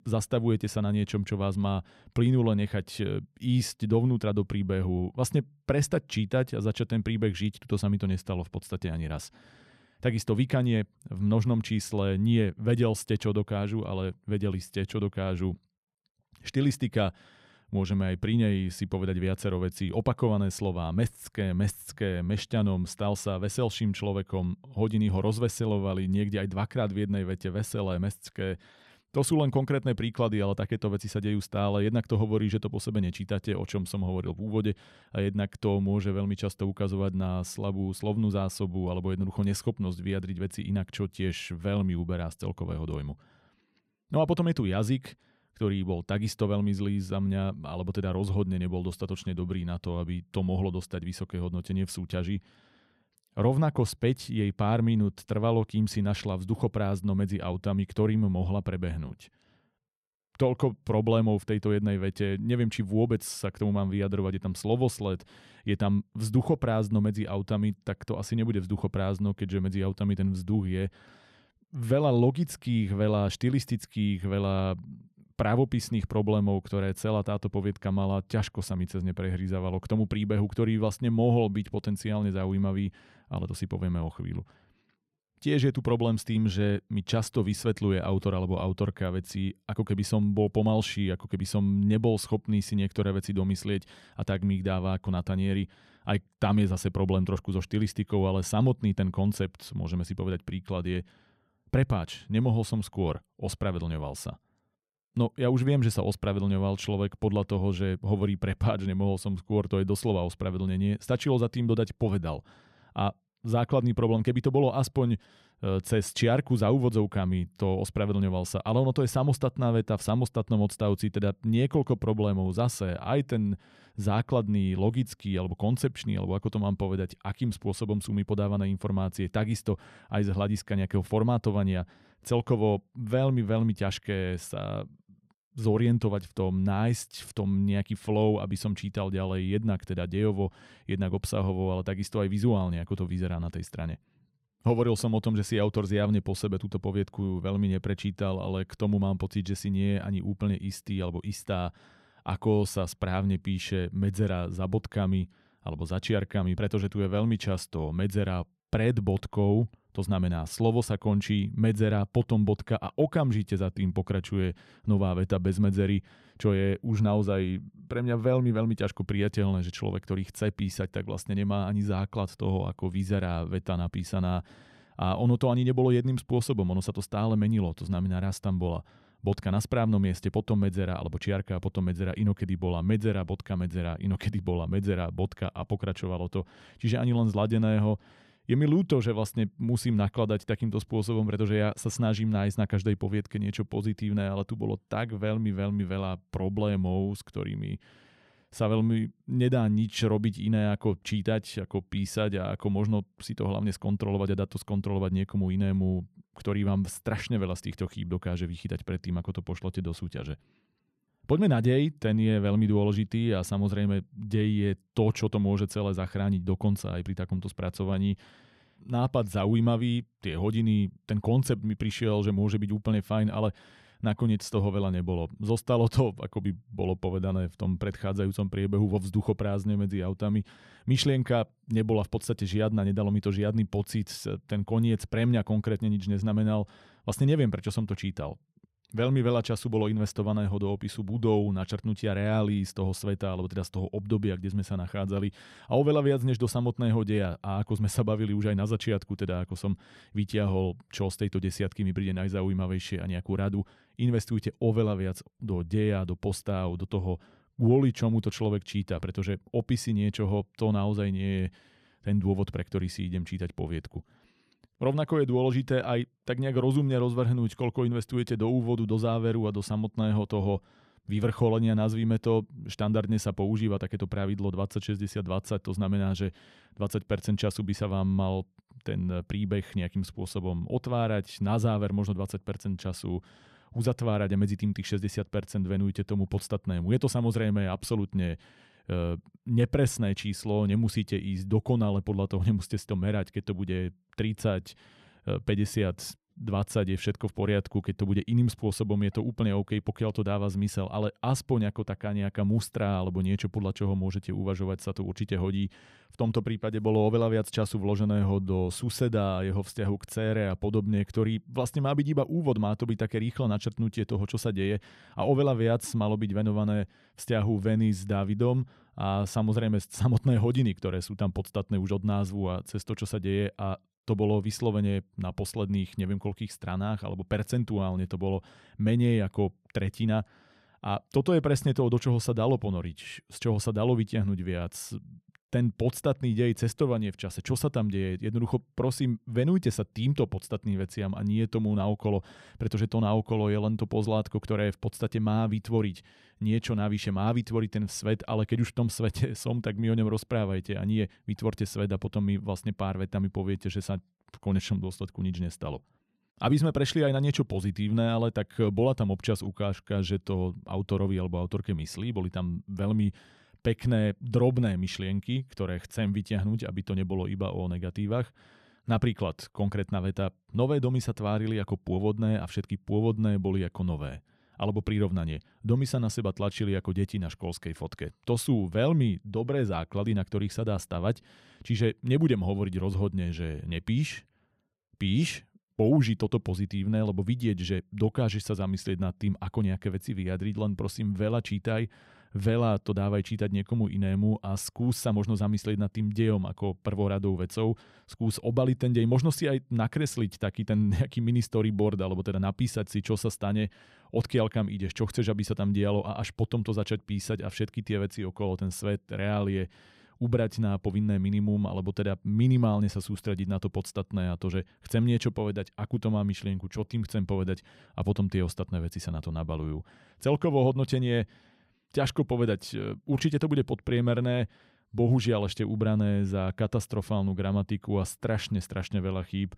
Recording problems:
none

